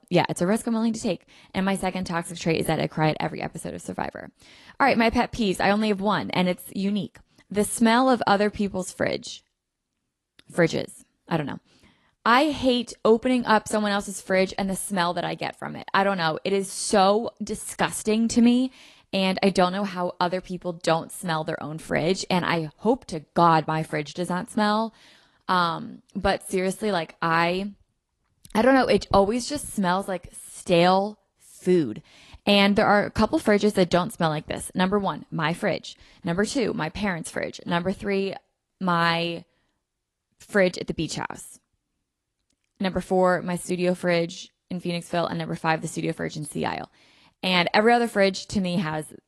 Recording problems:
garbled, watery; slightly; nothing above 11.5 kHz

